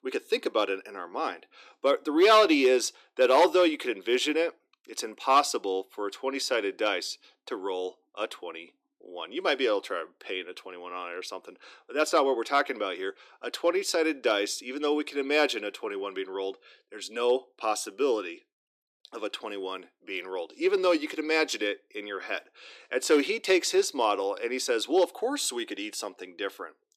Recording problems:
thin; very slightly; fading below 300 Hz

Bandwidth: 14.5 kHz